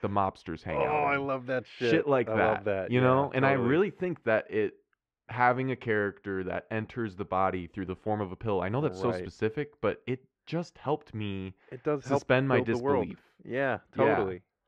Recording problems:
muffled; very; fading above 2.5 kHz

